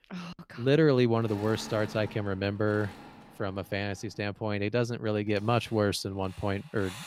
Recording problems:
machinery noise; noticeable; throughout; 20 dB below the speech

